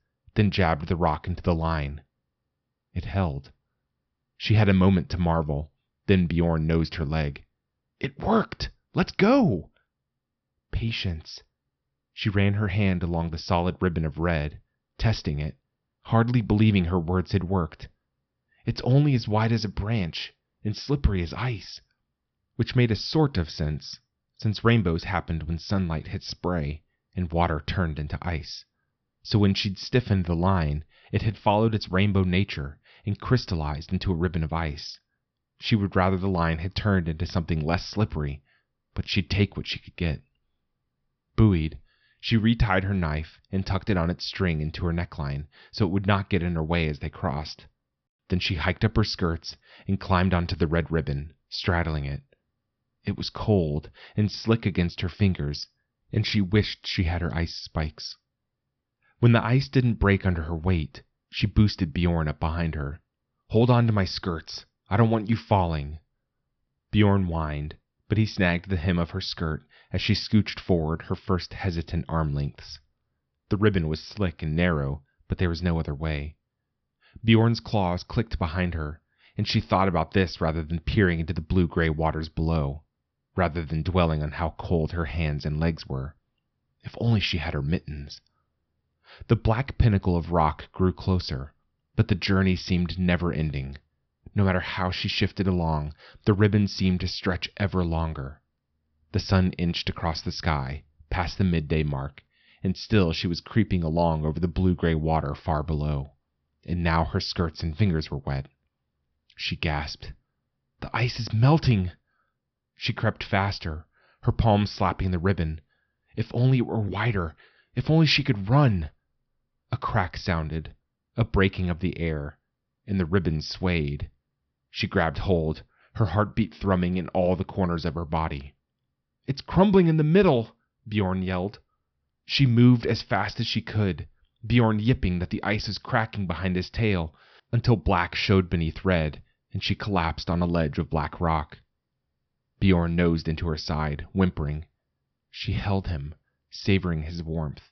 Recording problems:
high frequencies cut off; noticeable; nothing above 5.5 kHz

